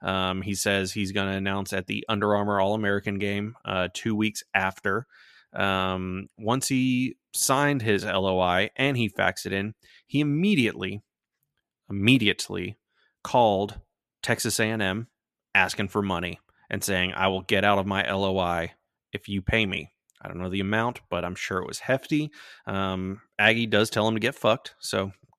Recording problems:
none

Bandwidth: 14 kHz